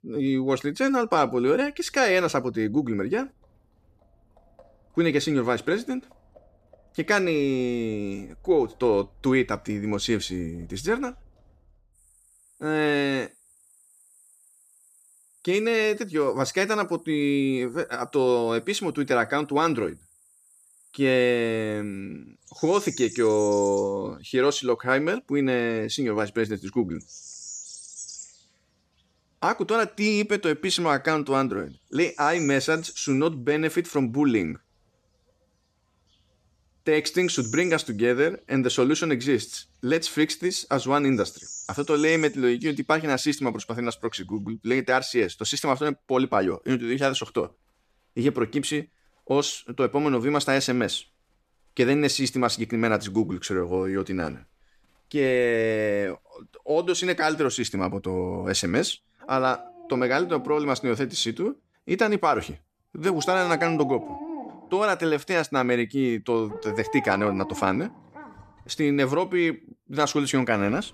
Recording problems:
animal sounds; noticeable; throughout; 15 dB below the speech

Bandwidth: 14.5 kHz